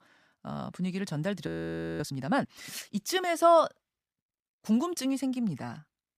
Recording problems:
audio freezing; at 1.5 s for 0.5 s

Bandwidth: 15 kHz